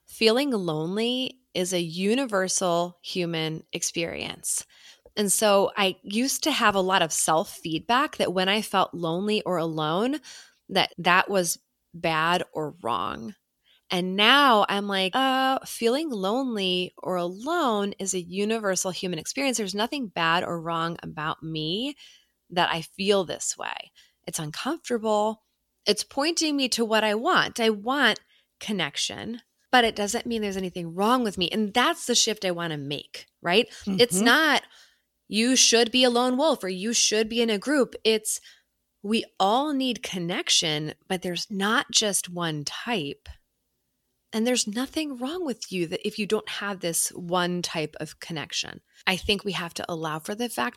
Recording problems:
none

